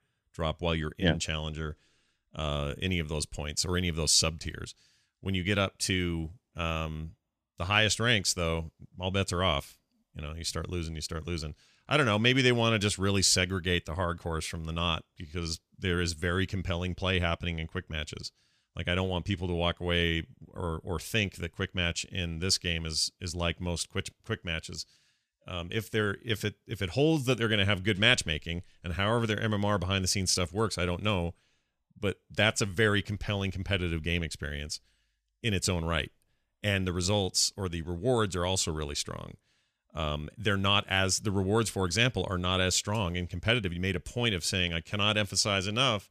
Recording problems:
none

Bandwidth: 14.5 kHz